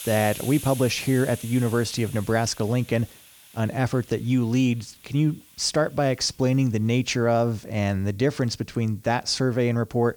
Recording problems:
hiss; noticeable; throughout; 15 dB below the speech

